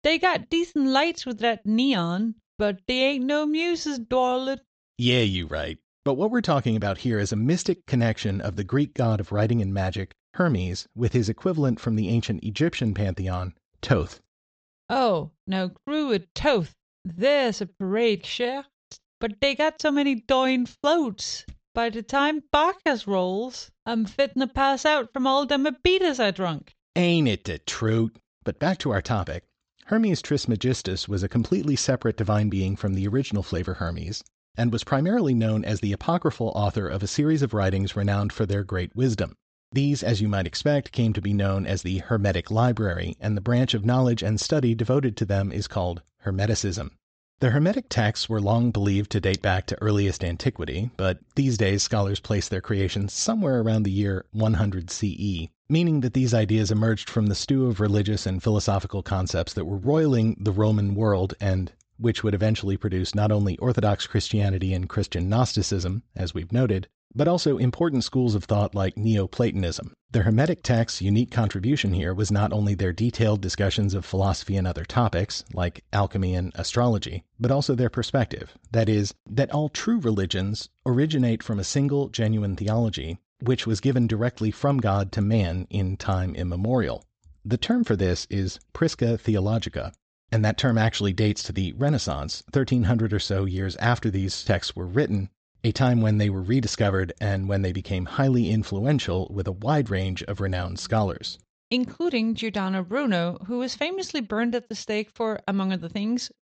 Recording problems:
high frequencies cut off; noticeable; nothing above 8 kHz

